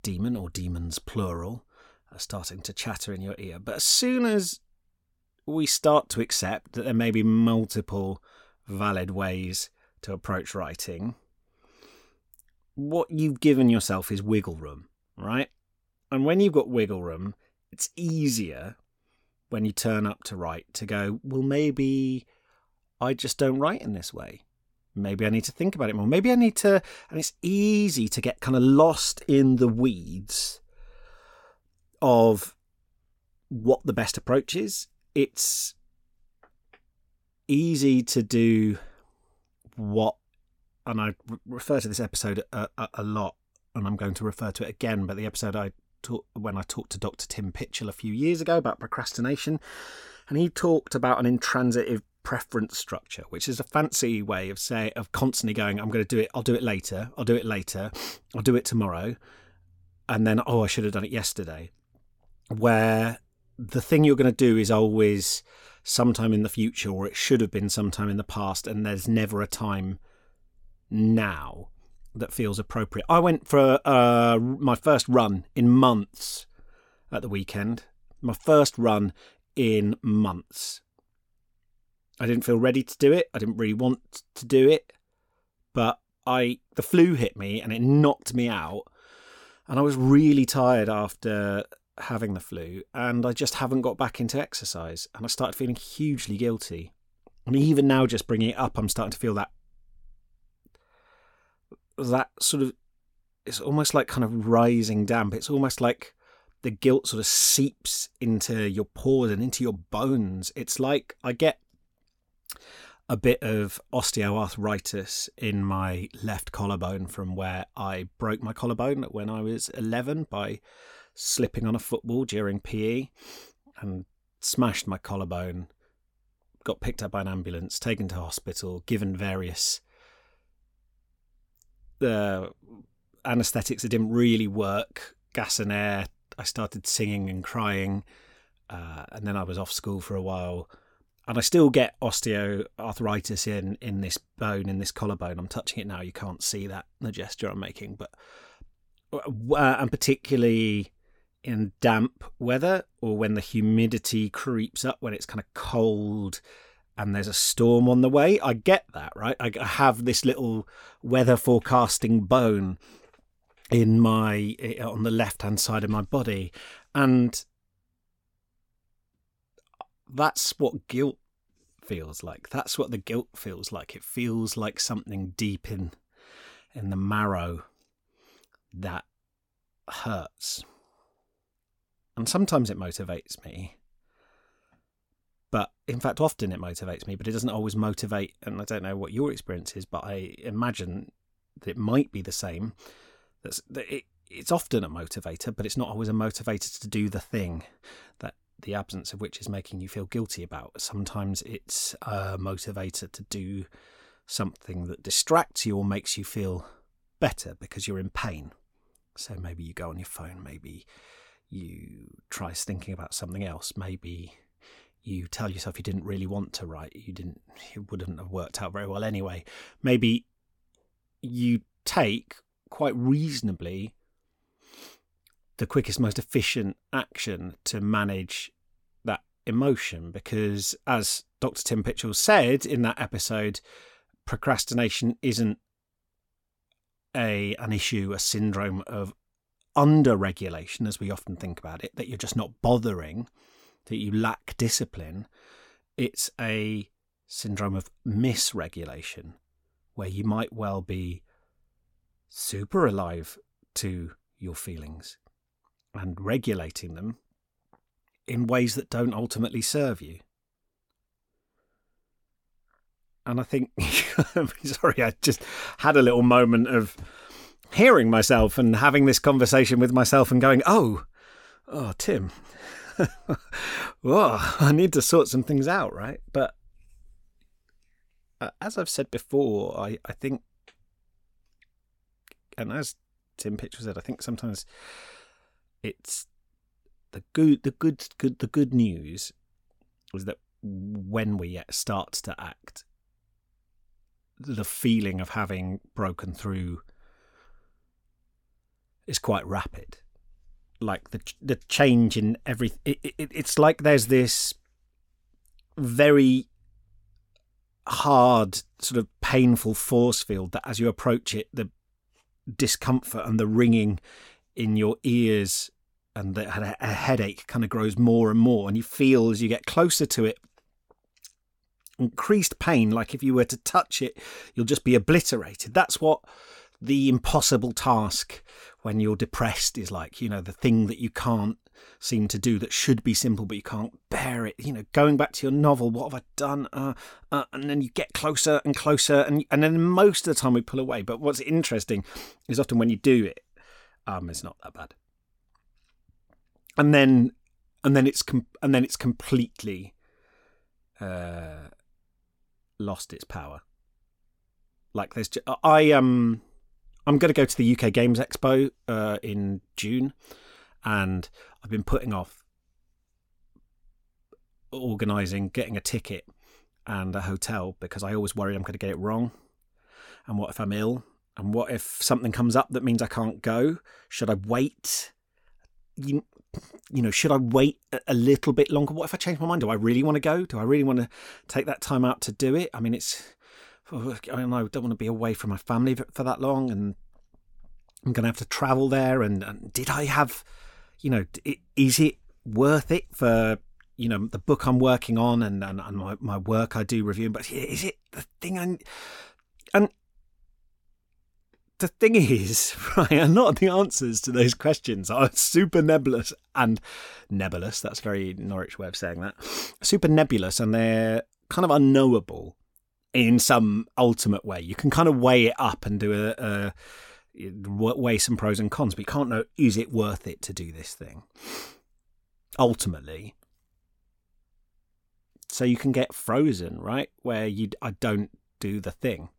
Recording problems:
none

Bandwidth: 17 kHz